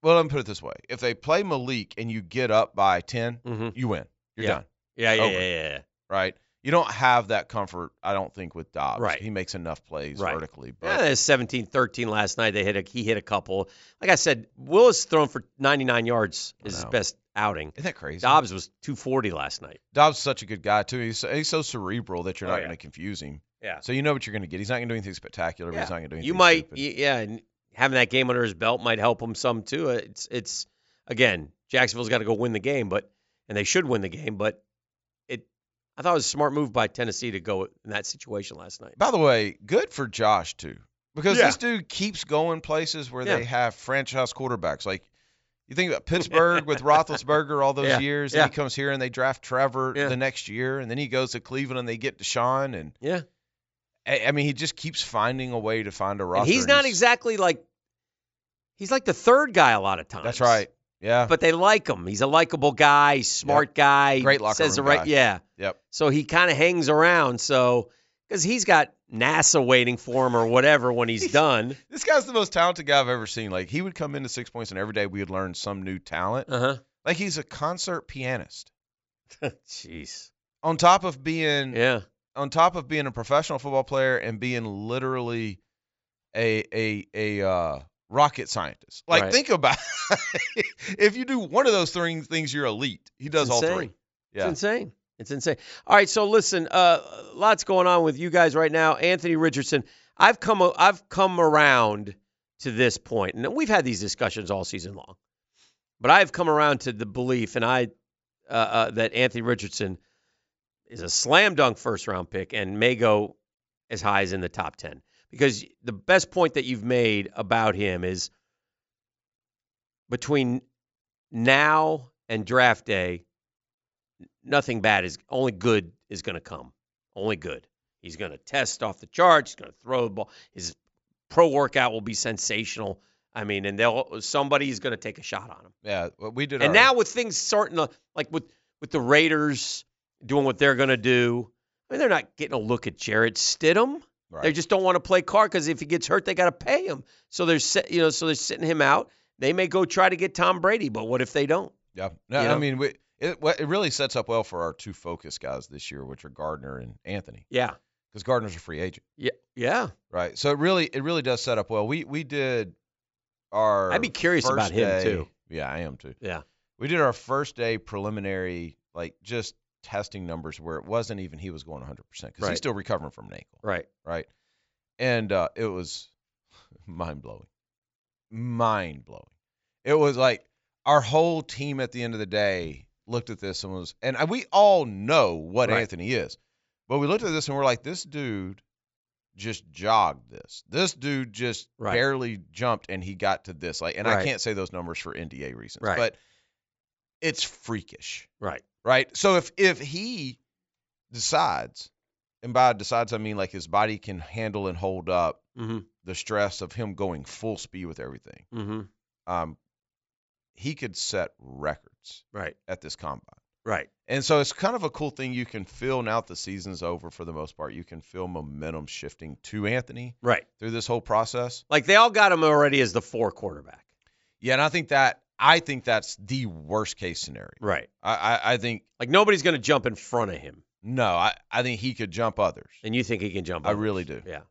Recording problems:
high frequencies cut off; noticeable; nothing above 8 kHz

